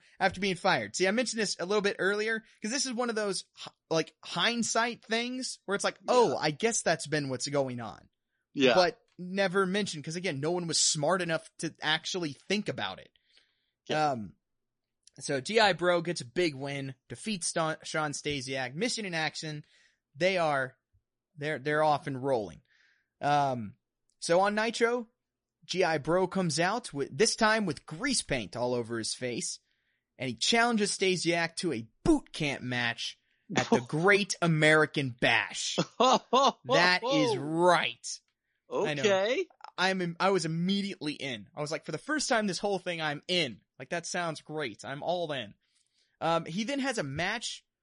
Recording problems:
garbled, watery; slightly; nothing above 10.5 kHz

